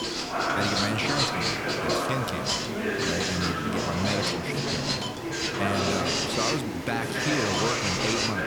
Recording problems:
household noises; very loud; throughout; 2 dB above the speech
chatter from many people; very loud; throughout; 2 dB above the speech
hiss; loud; throughout; 7 dB below the speech

